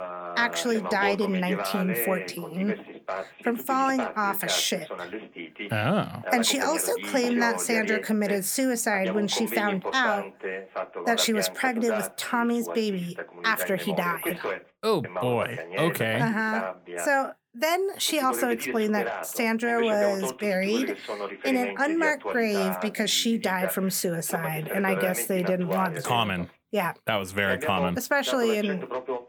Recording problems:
voice in the background; loud; throughout; 7 dB below the speech

